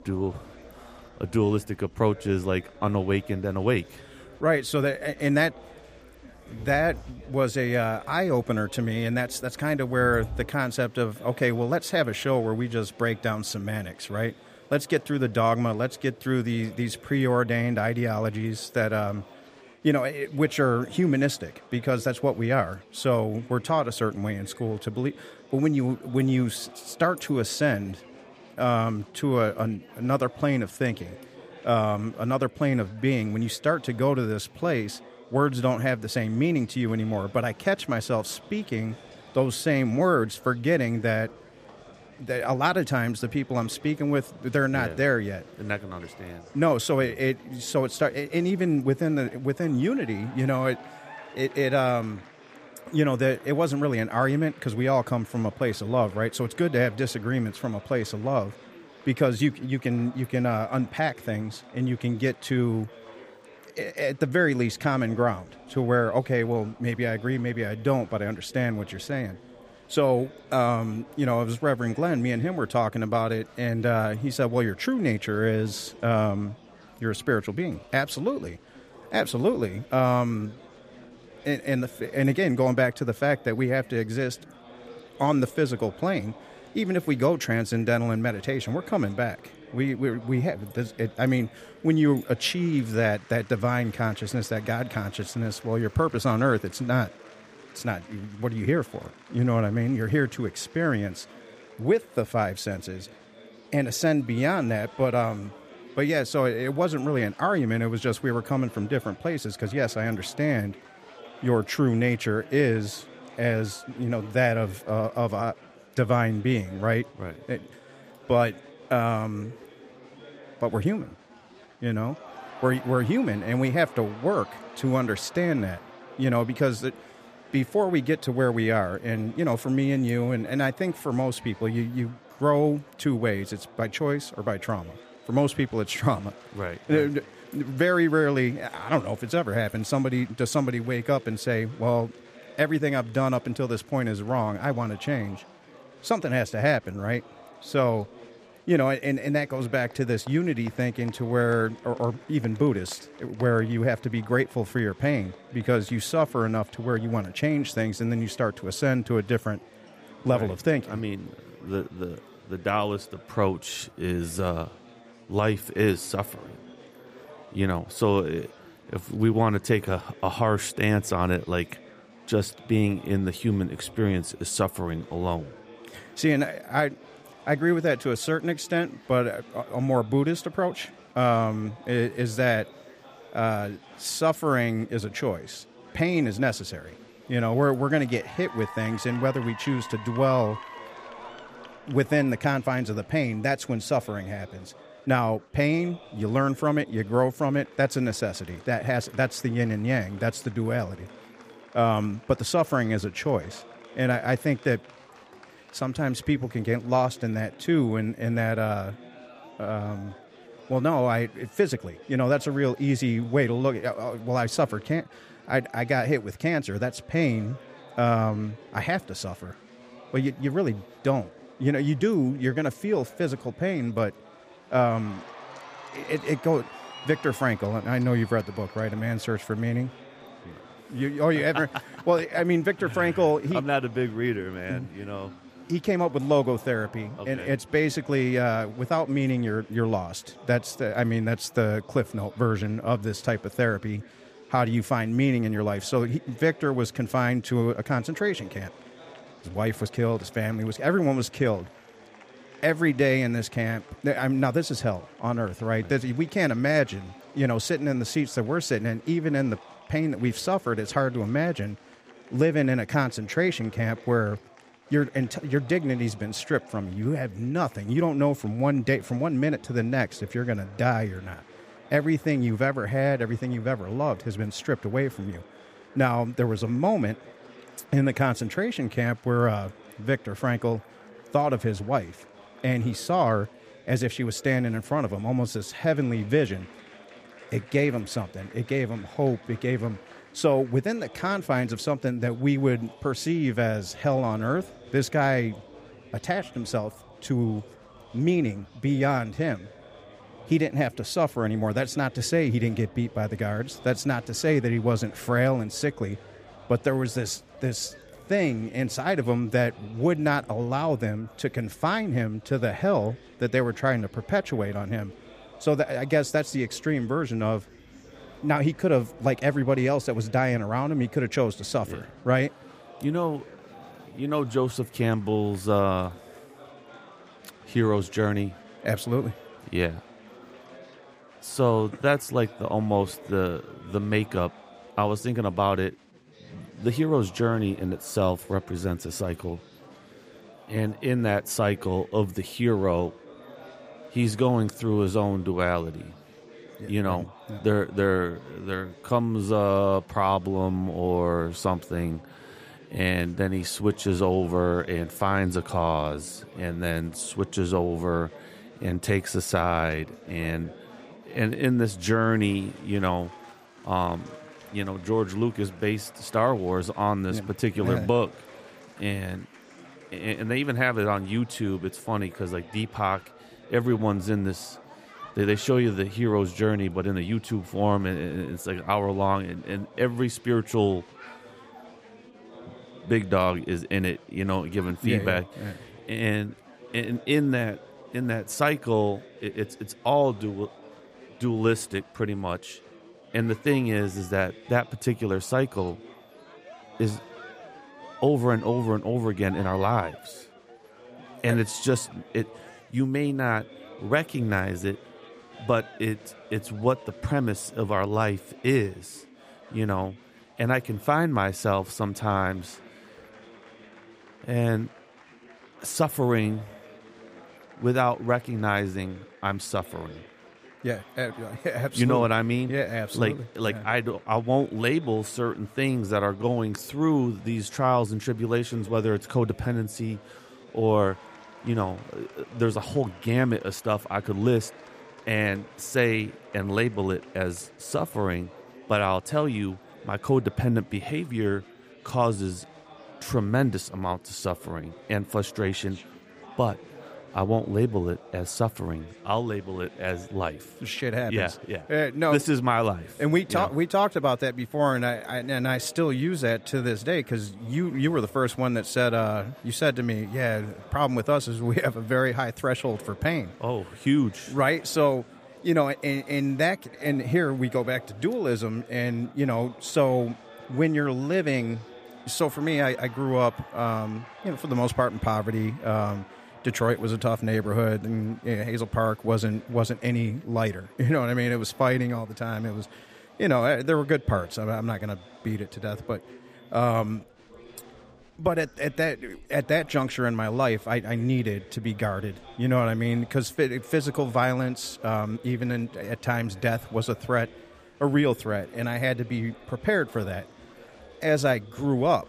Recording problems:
chatter from many people; faint; throughout; 20 dB below the speech

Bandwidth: 15 kHz